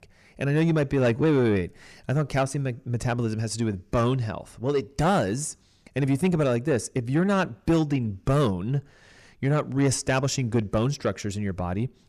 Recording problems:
distortion; slight; 10 dB below the speech

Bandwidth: 14.5 kHz